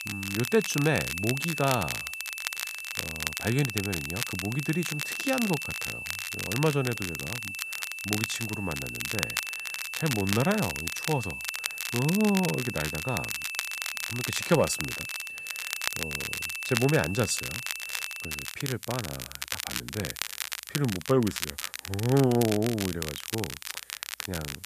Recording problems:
high-pitched whine; loud; until 18 s; 2.5 kHz, 6 dB below the speech
crackle, like an old record; loud; 5 dB below the speech
hiss; faint; throughout; 25 dB below the speech

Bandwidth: 14.5 kHz